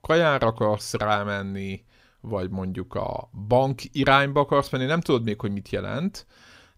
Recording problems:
none

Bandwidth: 15.5 kHz